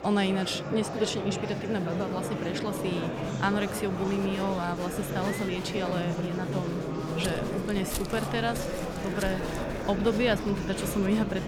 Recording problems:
murmuring crowd; loud; throughout; 3 dB below the speech
footsteps; noticeable; from 7 to 10 s; peak 6 dB below the speech

